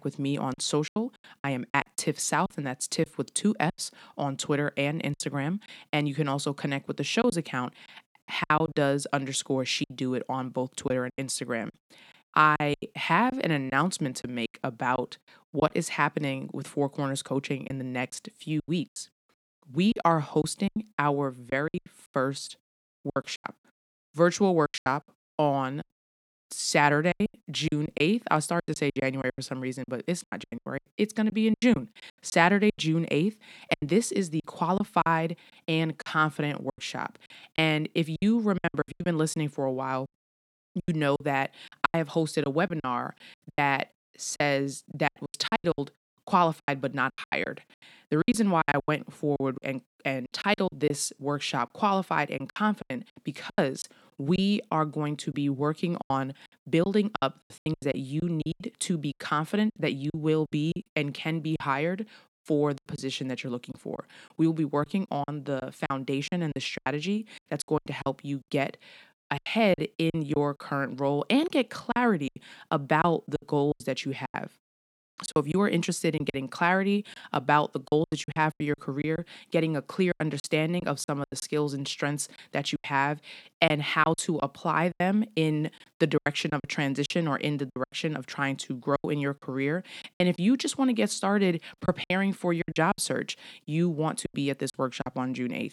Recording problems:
choppy; very; 12% of the speech affected

